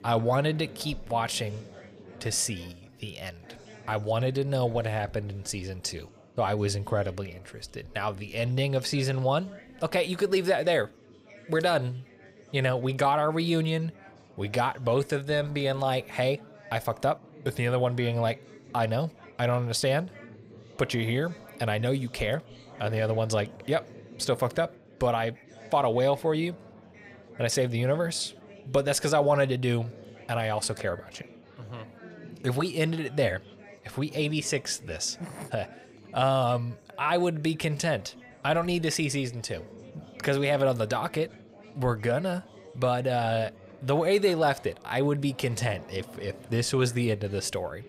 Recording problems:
chatter from many people; faint; throughout; 20 dB below the speech

